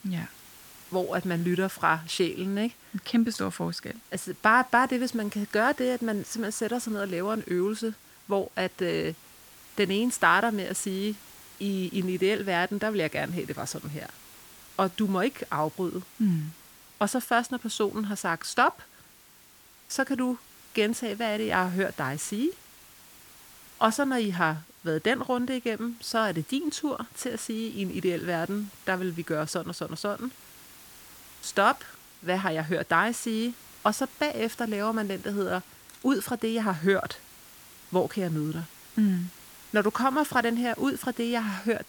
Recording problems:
hiss; faint; throughout; 20 dB below the speech

